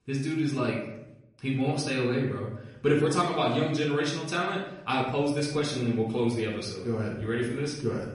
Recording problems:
off-mic speech; far
room echo; noticeable; dies away in 0.6 s
garbled, watery; slightly; nothing above 10.5 kHz

